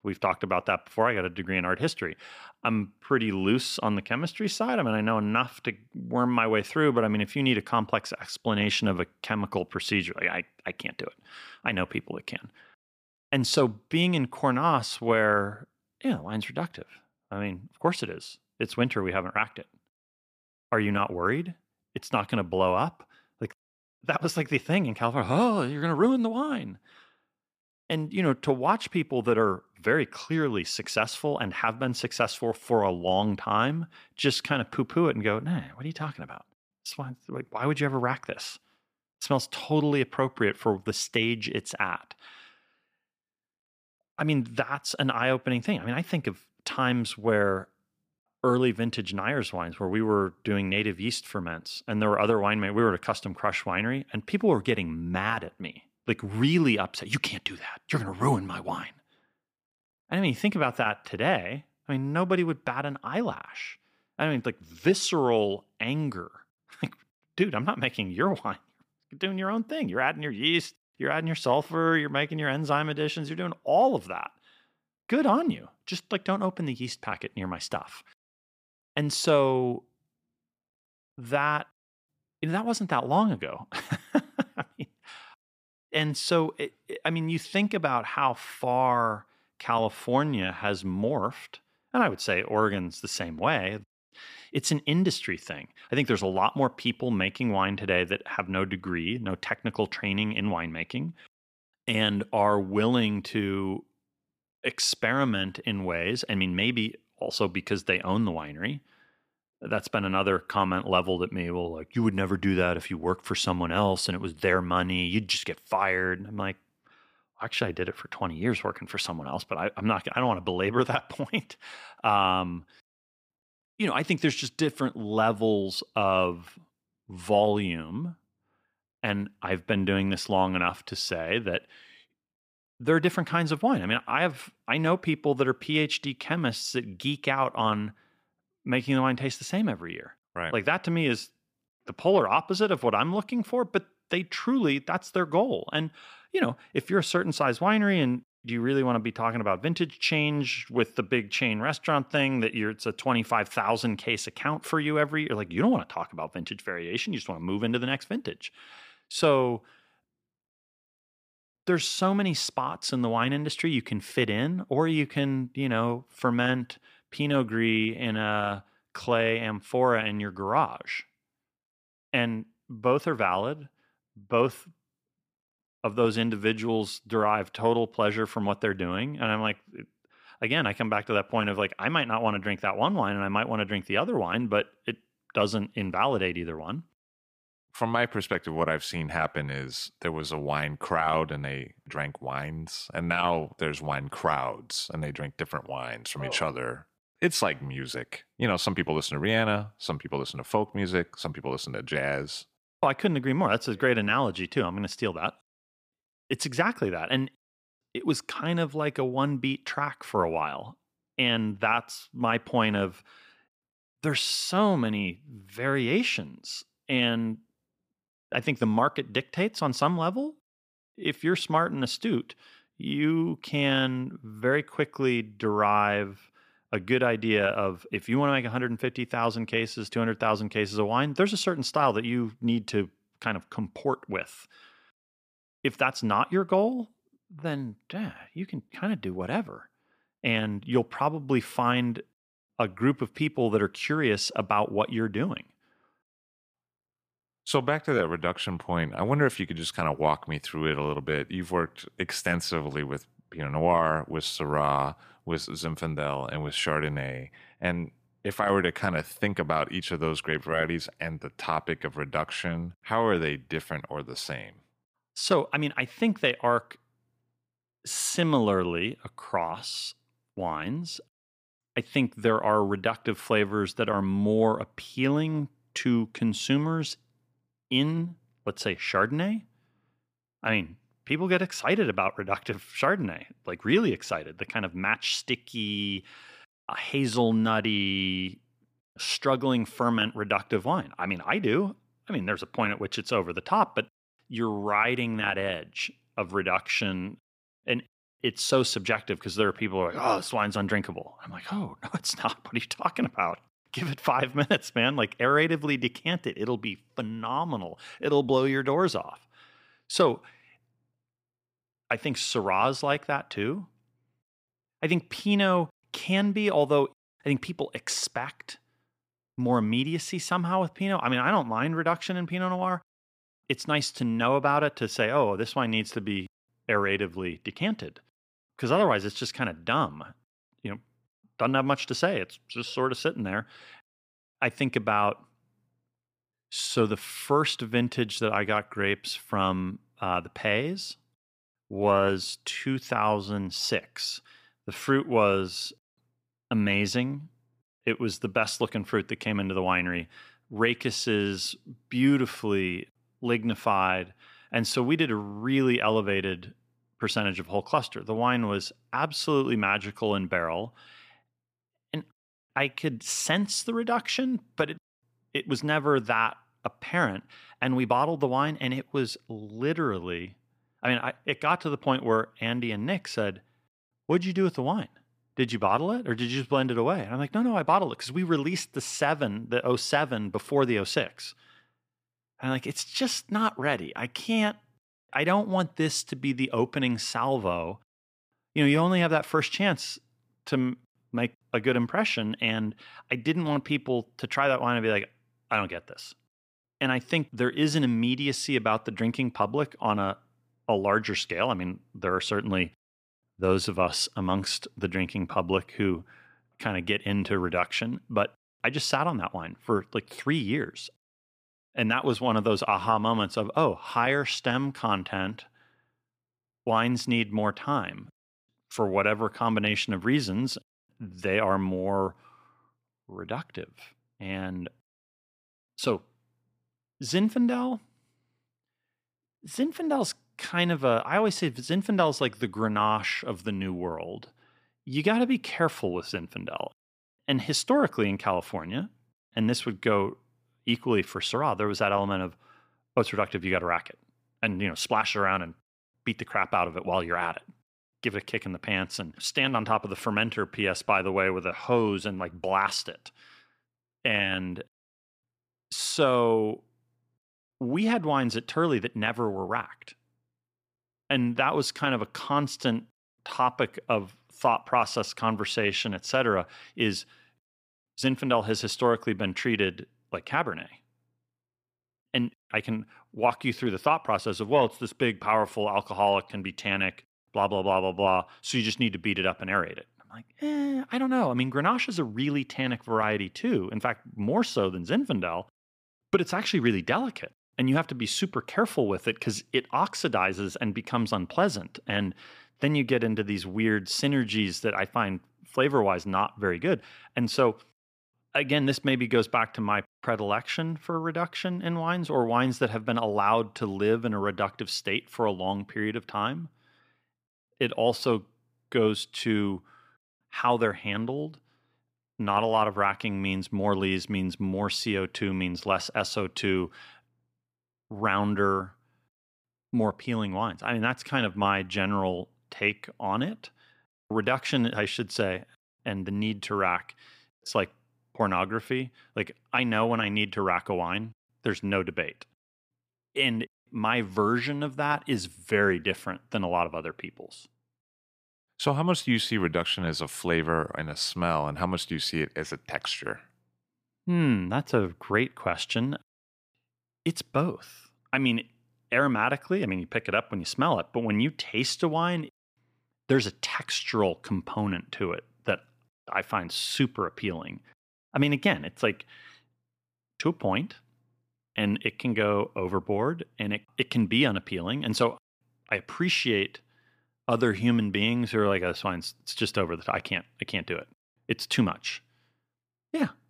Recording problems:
none

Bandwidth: 15 kHz